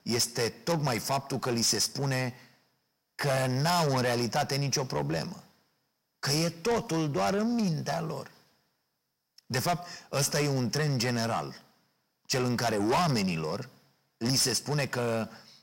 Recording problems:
distortion; heavy; 6 dB below the speech

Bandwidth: 16 kHz